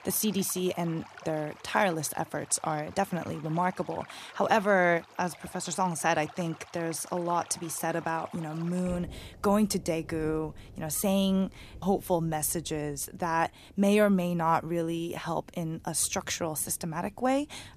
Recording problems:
rain or running water; faint; throughout; 20 dB below the speech

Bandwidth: 14.5 kHz